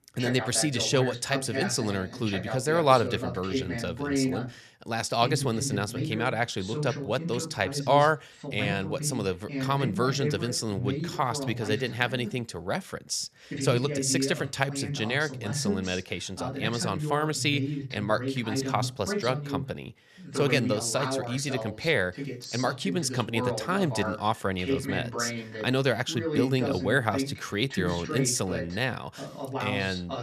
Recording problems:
voice in the background; loud; throughout; 5 dB below the speech

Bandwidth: 13.5 kHz